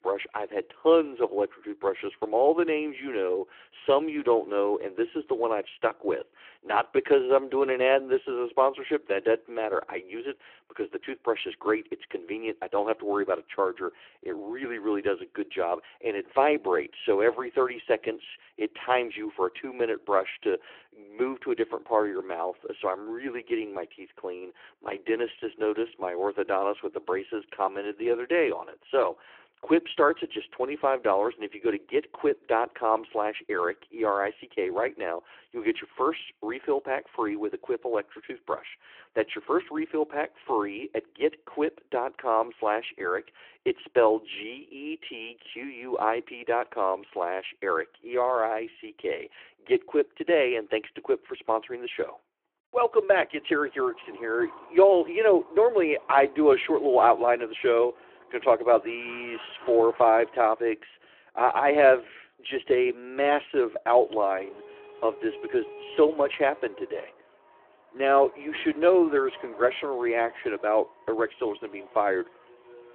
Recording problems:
phone-call audio
traffic noise; faint; from 53 s on; 20 dB below the speech

